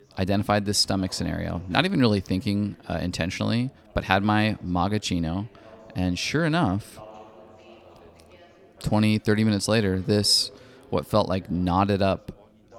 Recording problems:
background chatter; faint; throughout; 4 voices, 25 dB below the speech

